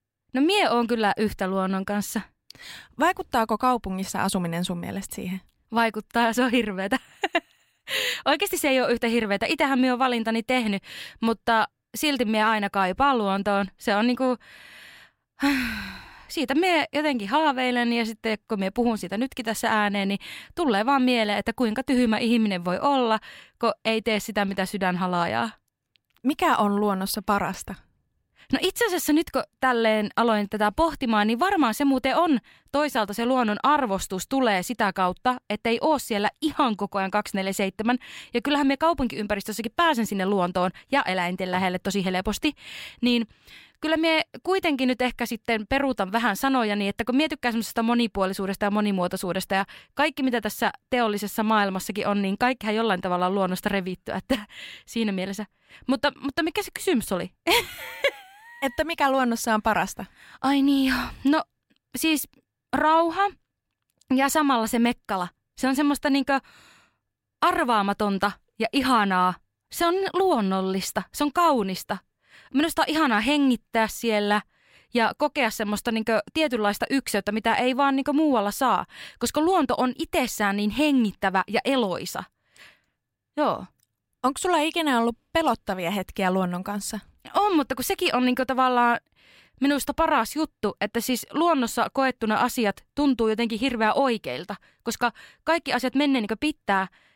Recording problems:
none

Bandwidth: 16 kHz